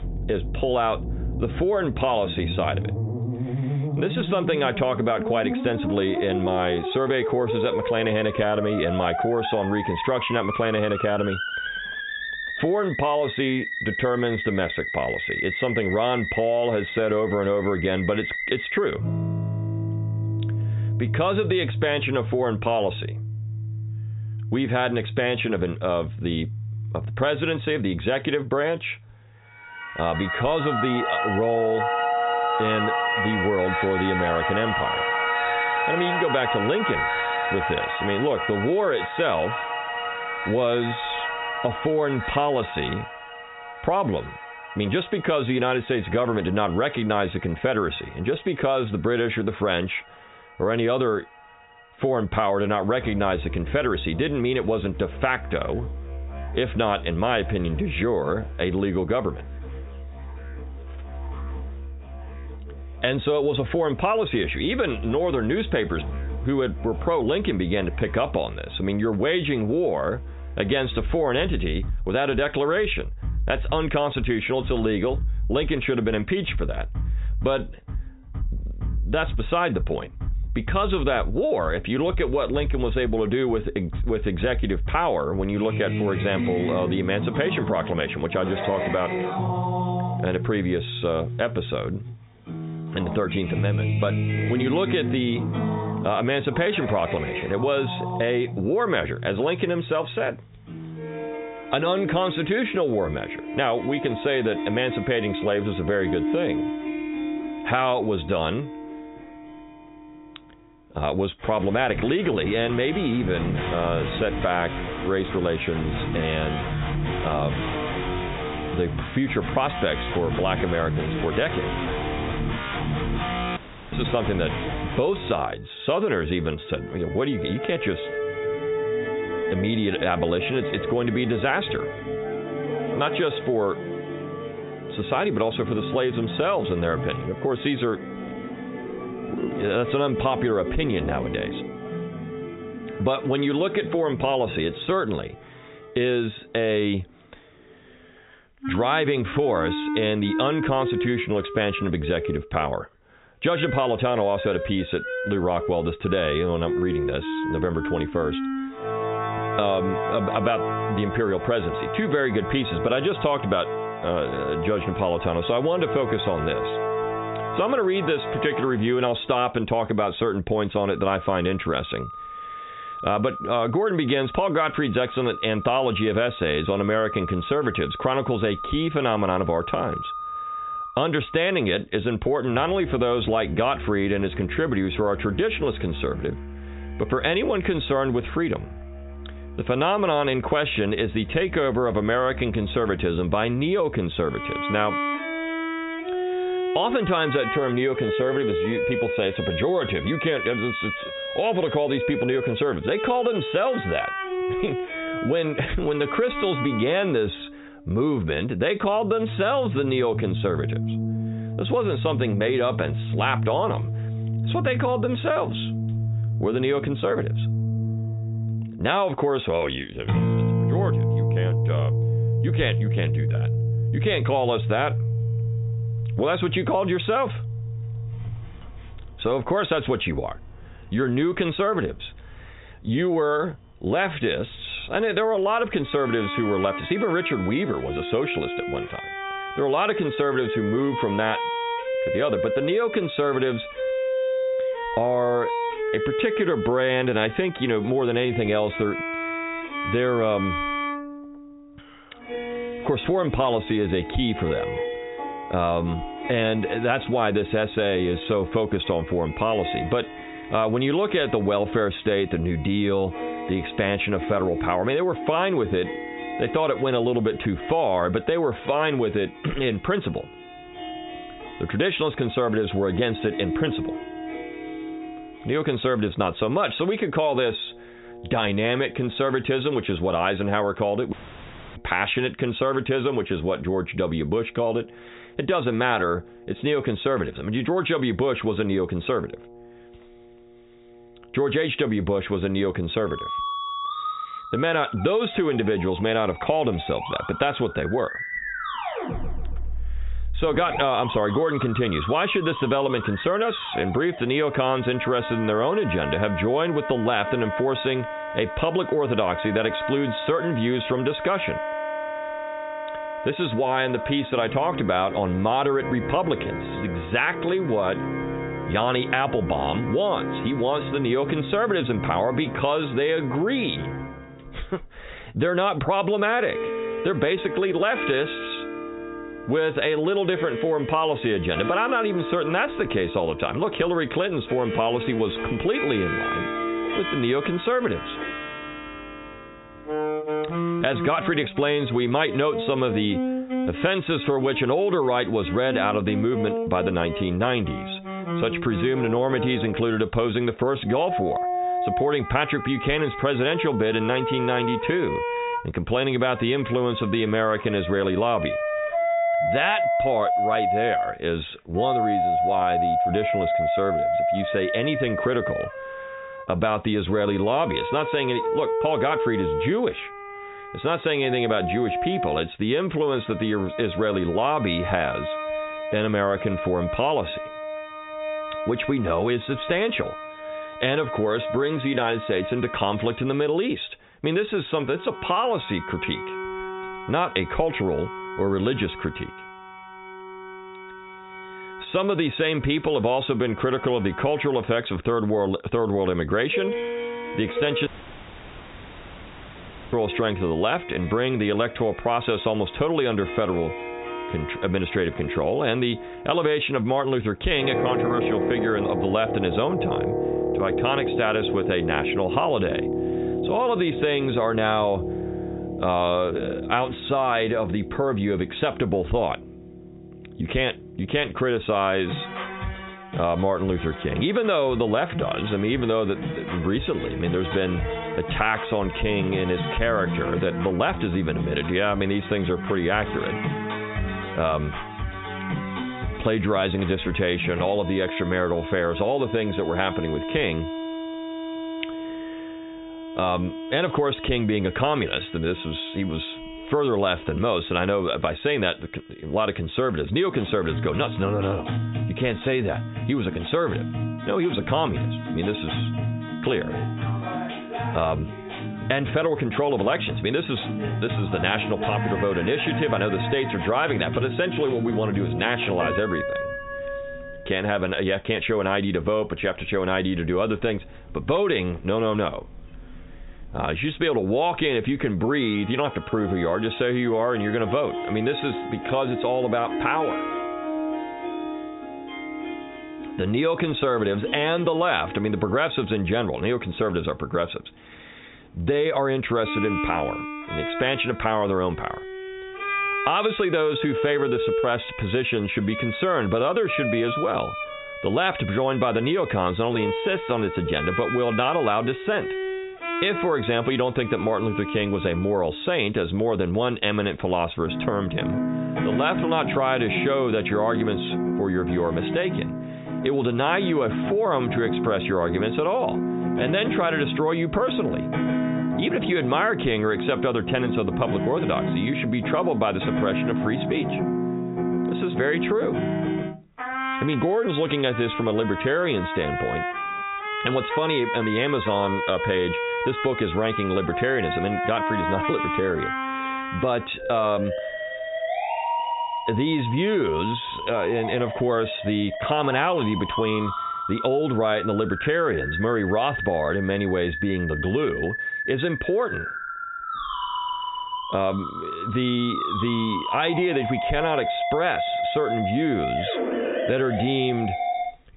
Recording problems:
high frequencies cut off; severe; nothing above 4 kHz
squashed, flat; heavily, background pumping
background music; loud; throughout; 6 dB below the speech
audio cutting out; at 2:04, at 4:41 for 0.5 s and at 6:38 for 2 s

